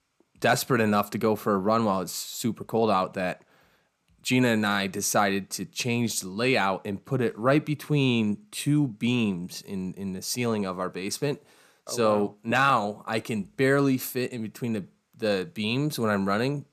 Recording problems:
none

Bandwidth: 14.5 kHz